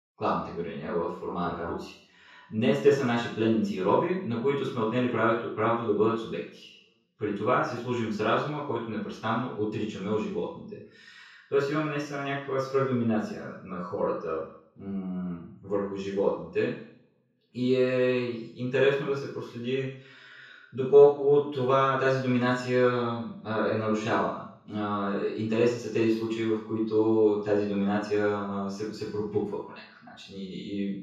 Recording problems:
off-mic speech; far
room echo; noticeable; dies away in 0.6 s

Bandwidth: 14 kHz